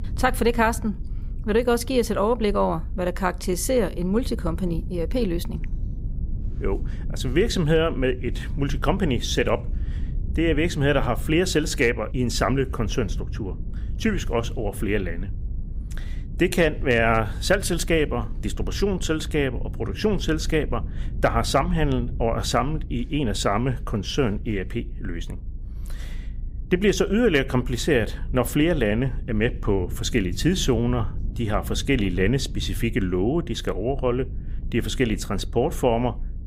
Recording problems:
low rumble; faint; throughout; 25 dB below the speech

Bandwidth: 15.5 kHz